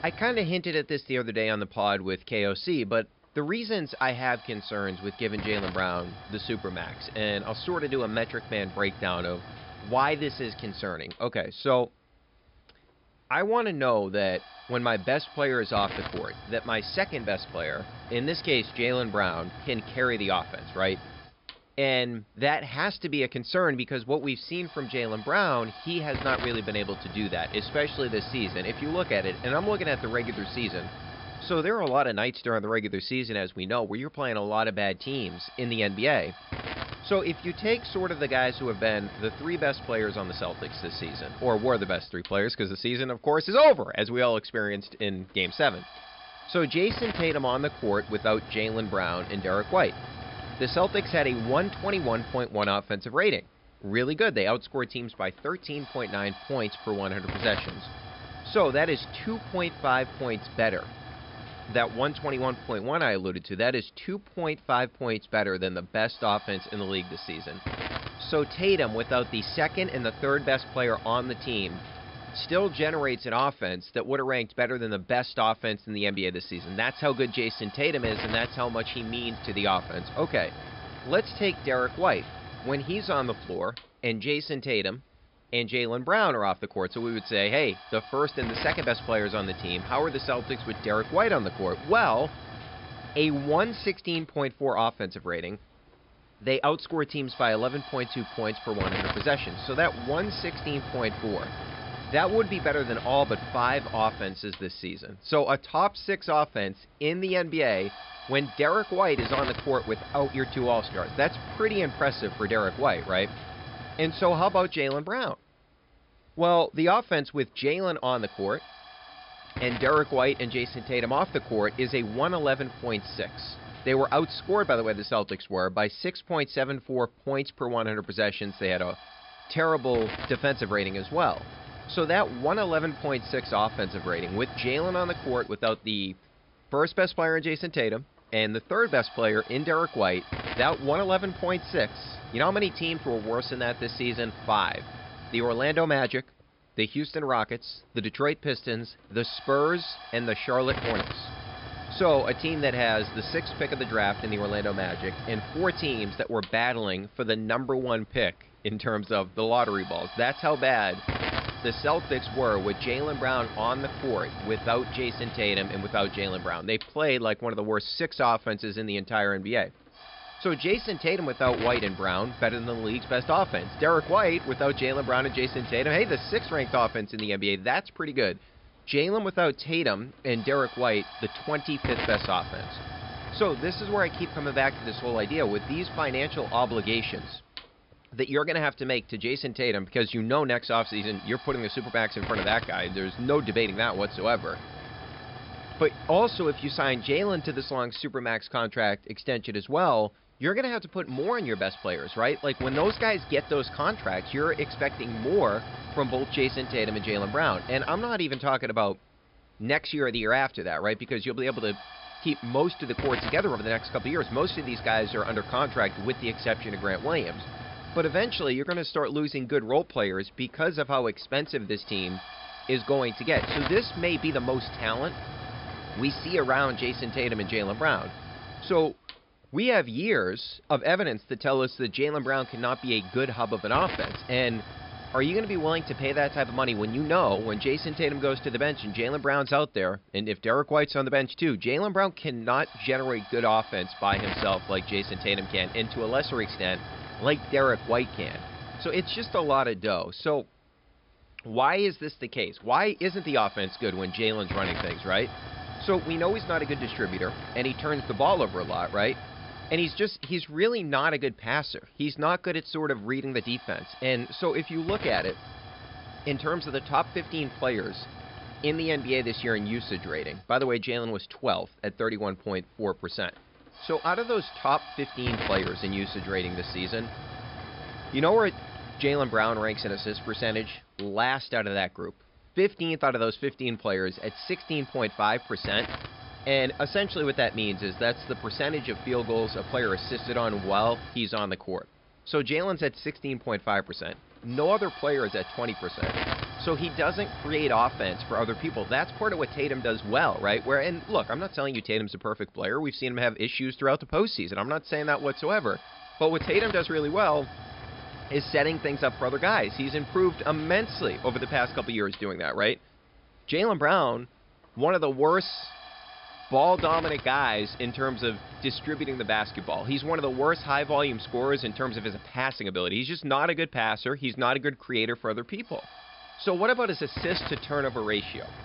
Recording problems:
high frequencies cut off; noticeable; nothing above 5.5 kHz
hiss; noticeable; throughout; 10 dB below the speech

